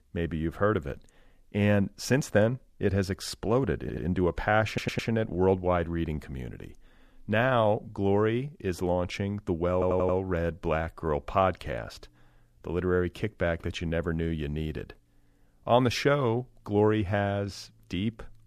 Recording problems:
audio stuttering; at 4 s, at 4.5 s and at 9.5 s

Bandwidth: 14.5 kHz